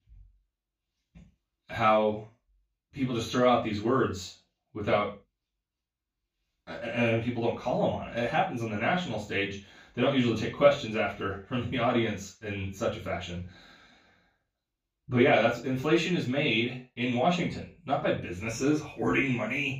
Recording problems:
off-mic speech; far
room echo; noticeable; dies away in 0.3 s

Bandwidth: 15 kHz